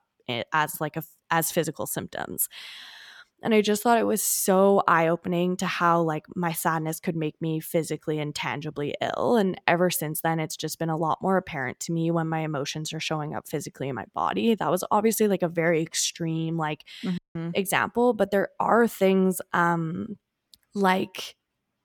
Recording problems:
audio cutting out; at 17 s

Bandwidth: 18.5 kHz